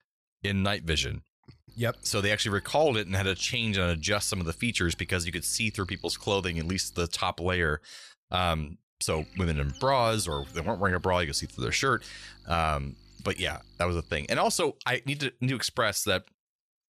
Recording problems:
electrical hum; faint; from 1.5 to 7 s and from 9 to 15 s; 50 Hz, 25 dB below the speech

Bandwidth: 13.5 kHz